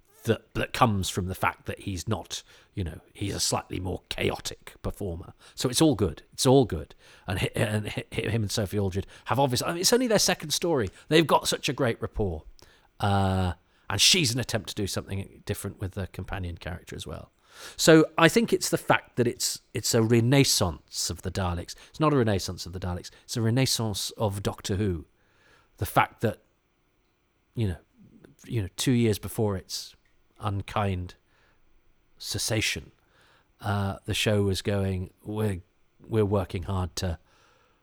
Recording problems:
none

